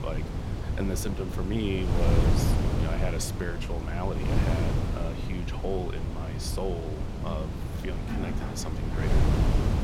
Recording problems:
wind noise on the microphone; heavy; as loud as the speech
rain or running water; loud; throughout; 9 dB below the speech

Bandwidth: 16 kHz